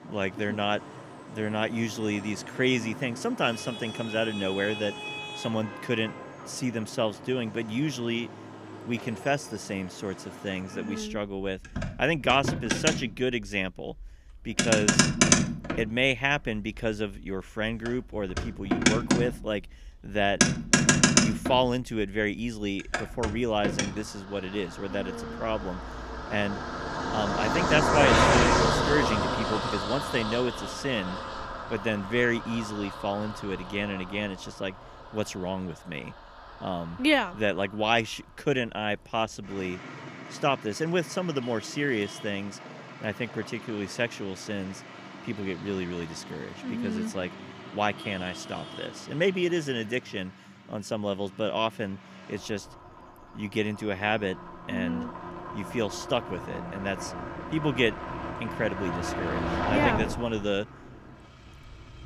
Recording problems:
traffic noise; very loud; throughout; 1 dB above the speech

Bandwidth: 15 kHz